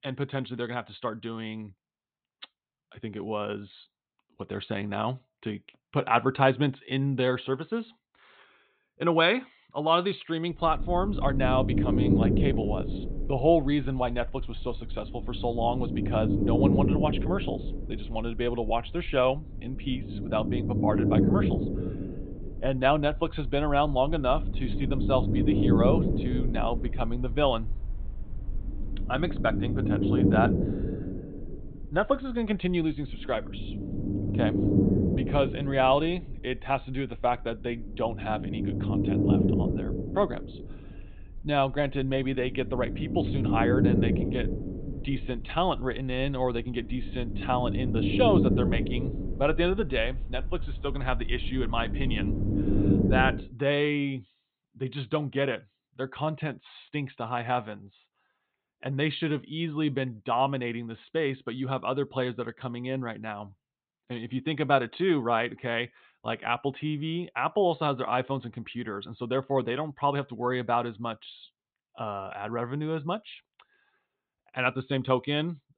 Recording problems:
high frequencies cut off; severe; nothing above 4 kHz
low rumble; loud; from 11 to 53 s; 4 dB below the speech

